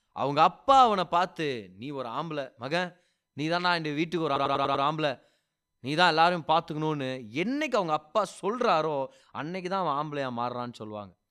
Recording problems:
audio stuttering; at 4.5 s

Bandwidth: 14.5 kHz